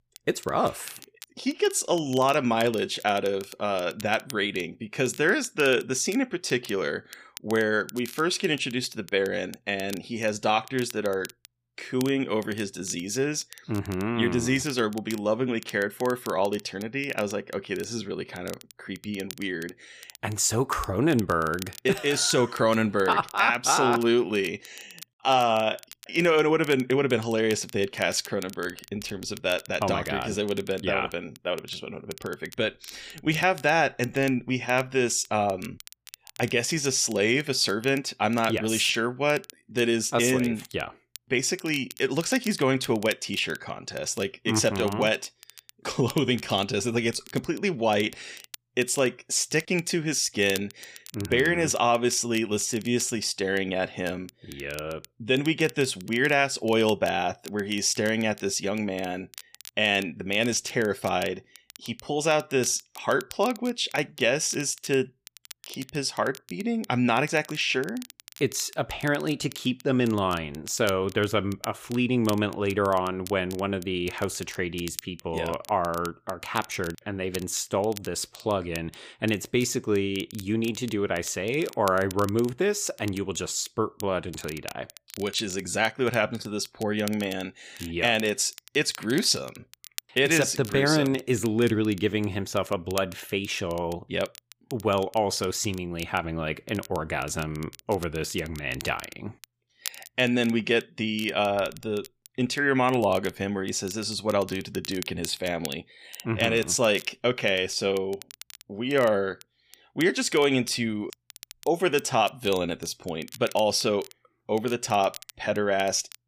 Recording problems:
crackle, like an old record; noticeable; 20 dB below the speech

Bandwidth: 15 kHz